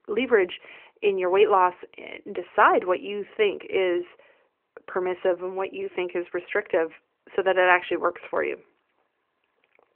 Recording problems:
phone-call audio; nothing above 3 kHz

